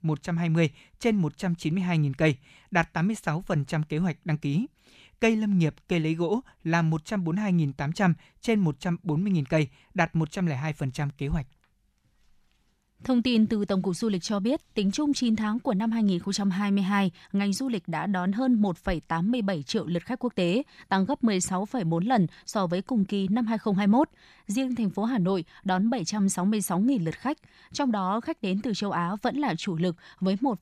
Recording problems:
none

